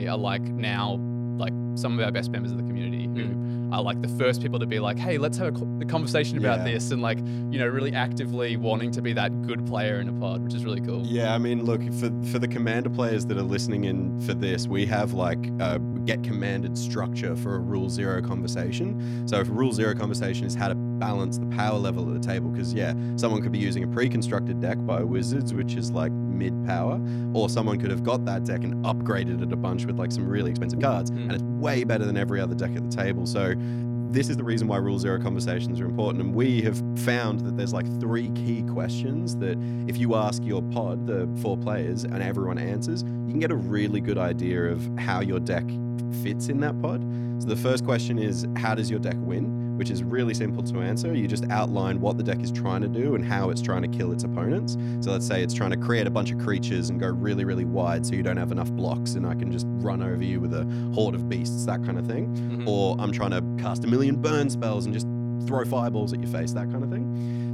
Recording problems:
electrical hum; loud; throughout; 60 Hz, 6 dB below the speech
abrupt cut into speech; at the start
uneven, jittery; strongly; from 16 s to 1:06

